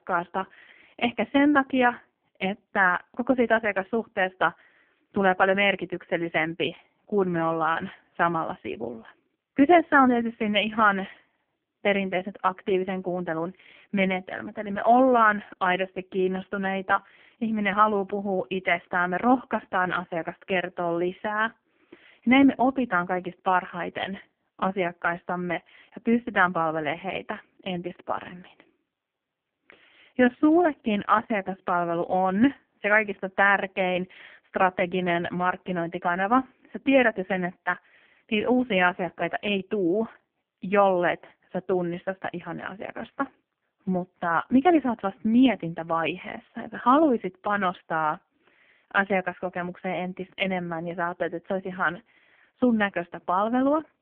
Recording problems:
phone-call audio; poor line; nothing above 3 kHz

